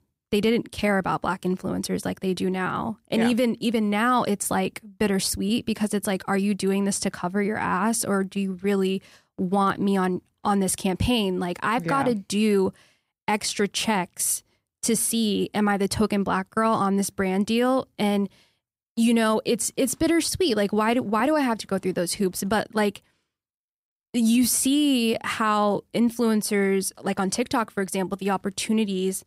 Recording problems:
none

